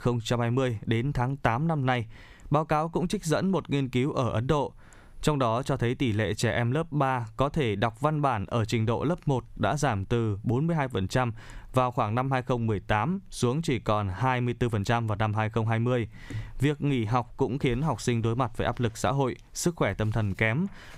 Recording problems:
squashed, flat; somewhat

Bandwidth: 15.5 kHz